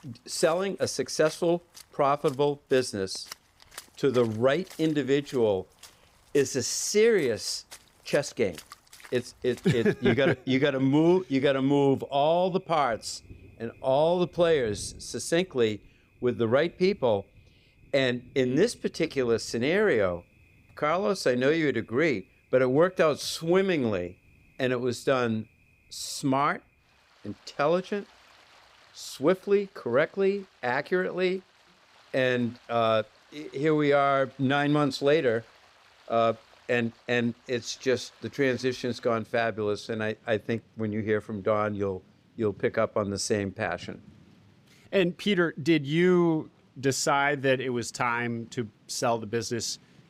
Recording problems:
rain or running water; faint; throughout; 25 dB below the speech

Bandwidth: 15.5 kHz